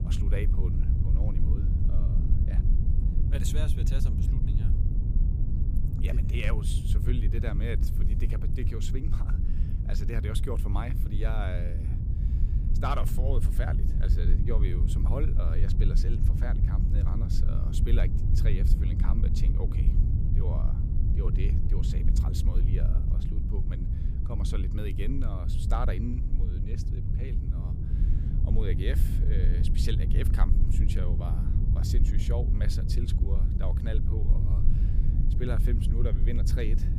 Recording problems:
low rumble; loud; throughout; 3 dB below the speech

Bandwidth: 15 kHz